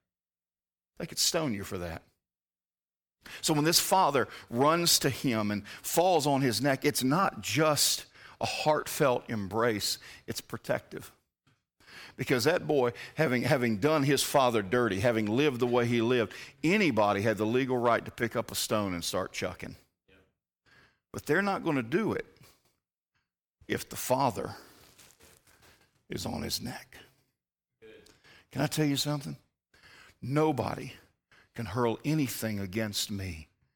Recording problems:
none

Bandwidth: 18 kHz